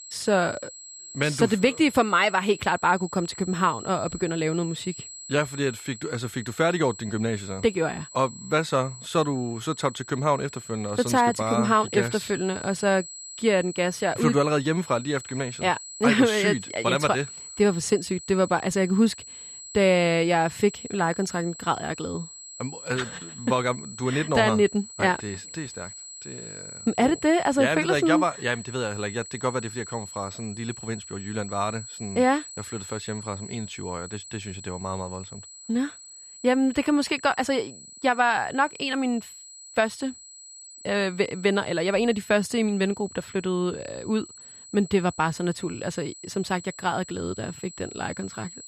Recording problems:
high-pitched whine; noticeable; throughout; 8 kHz, 15 dB below the speech

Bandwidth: 14.5 kHz